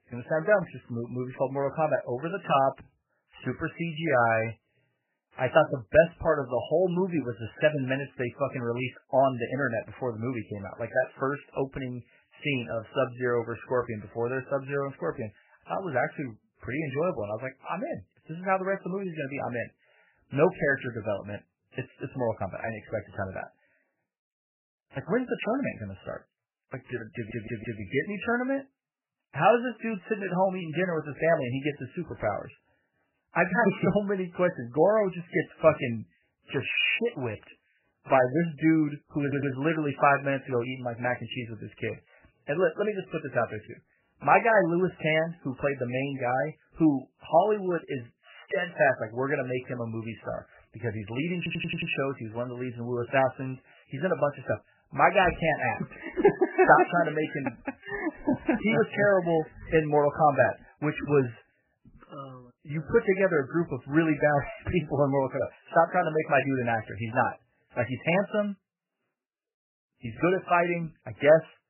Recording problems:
garbled, watery; badly; nothing above 3 kHz
audio stuttering; at 27 s, at 39 s and at 51 s

